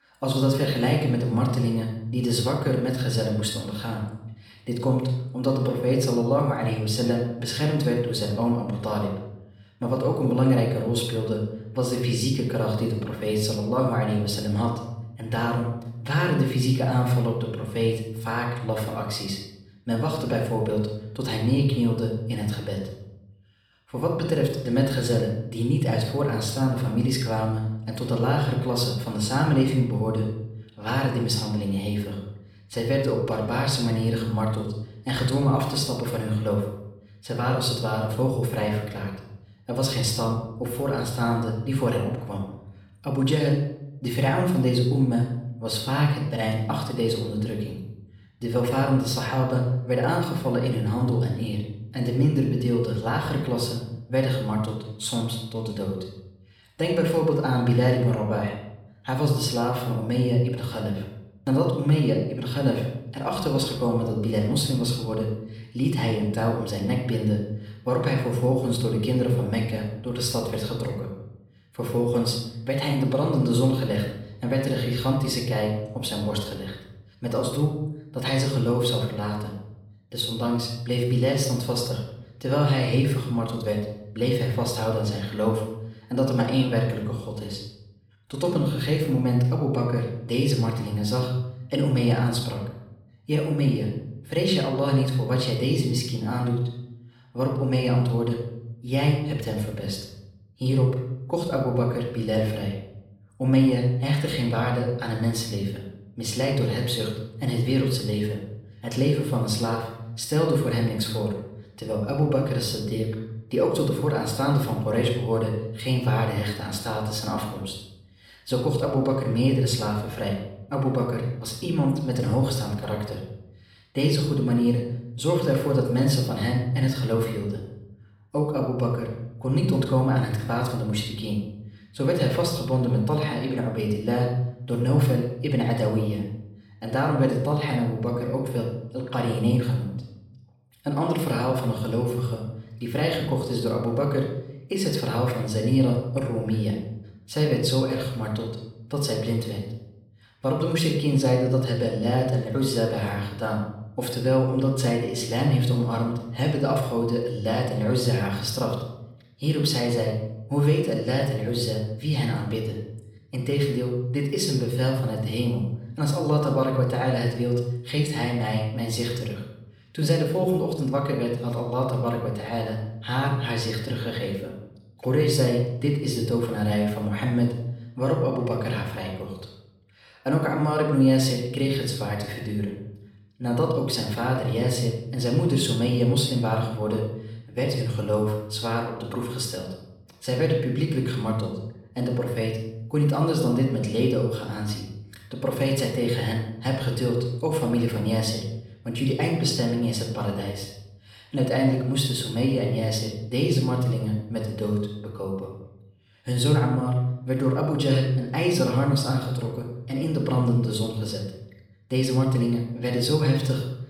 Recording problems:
off-mic speech; far
room echo; noticeable; dies away in 0.7 s

